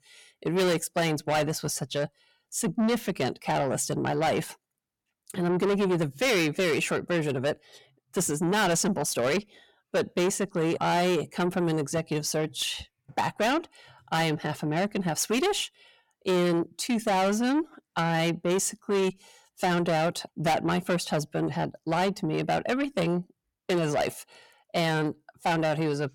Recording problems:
distortion; heavy; 6 dB below the speech

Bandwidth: 17.5 kHz